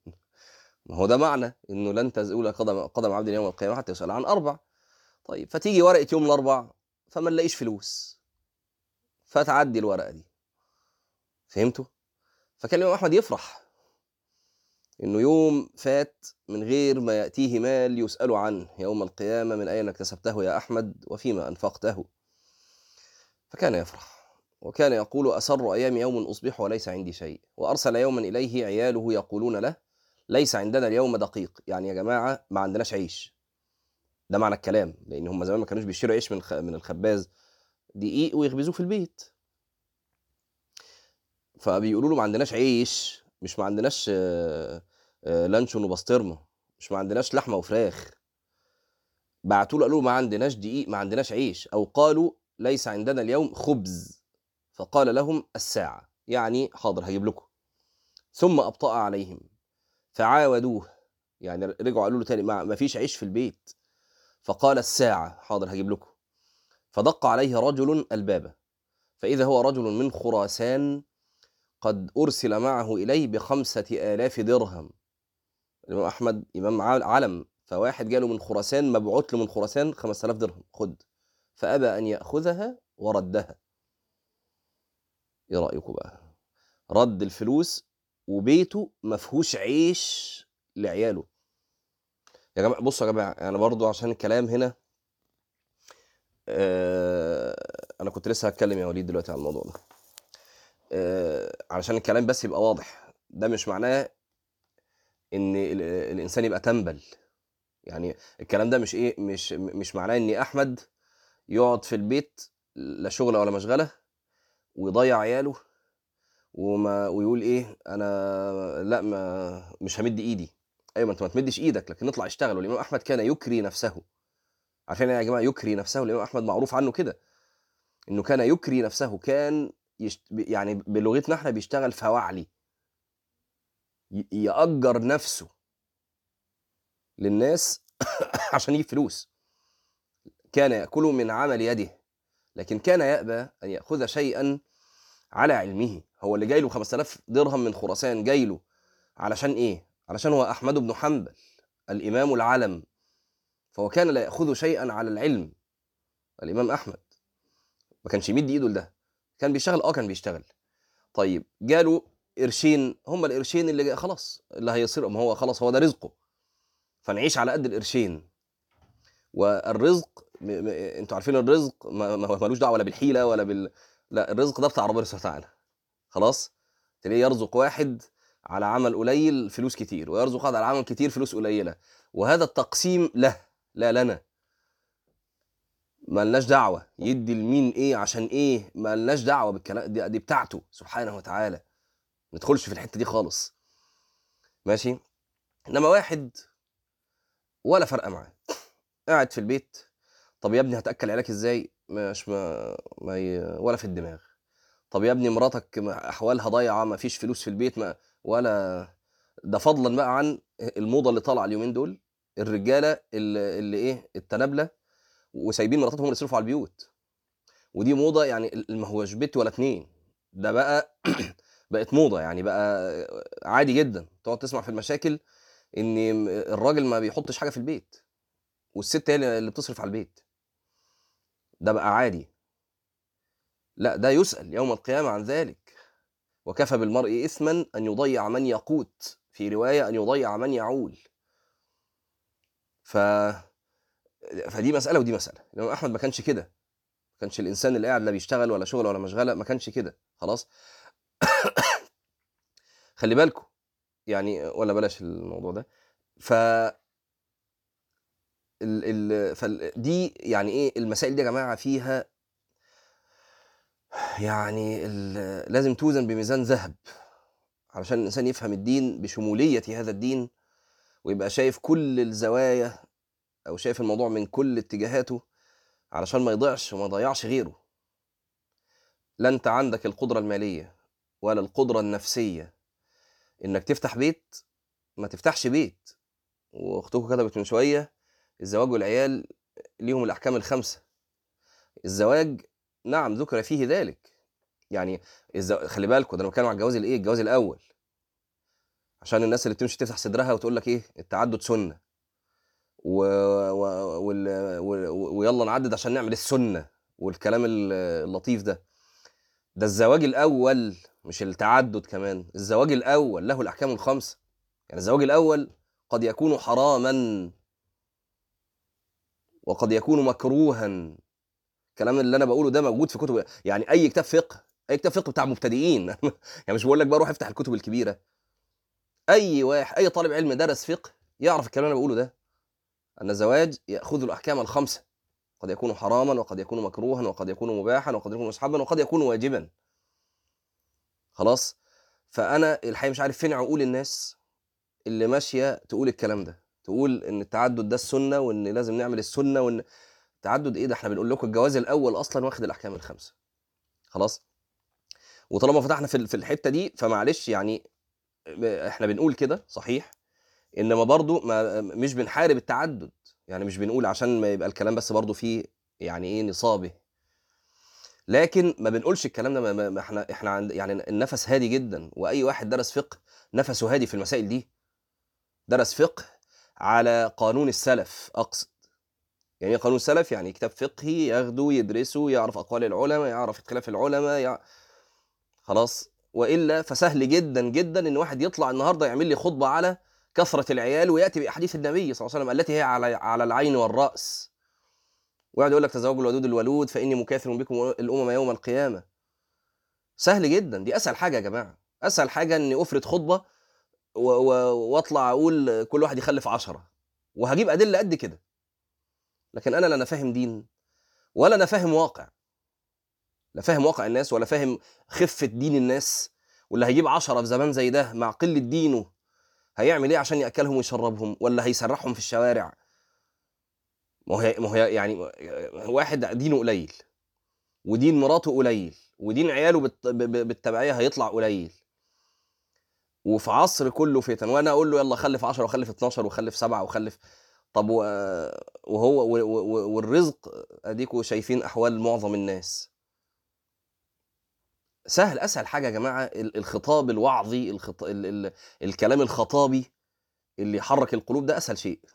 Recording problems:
uneven, jittery; strongly; from 1:33 to 5:45

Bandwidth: 18.5 kHz